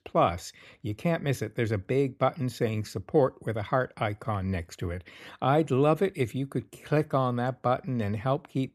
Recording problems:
none

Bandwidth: 14 kHz